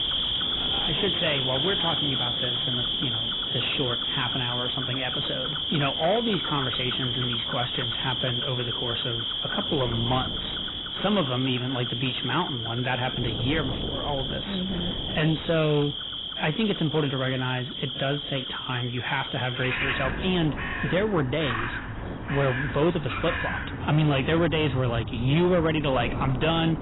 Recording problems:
garbled, watery; badly; nothing above 4 kHz
distortion; slight; 9 dB below the speech
animal sounds; loud; throughout; 1 dB below the speech
wind noise on the microphone; occasional gusts; 15 dB below the speech

